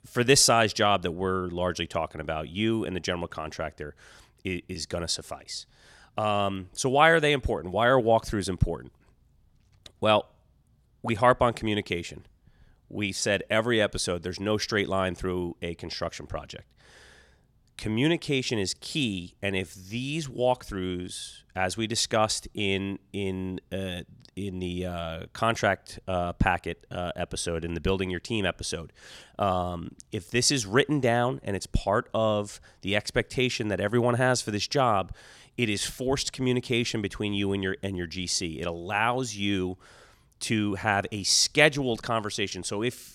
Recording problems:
none

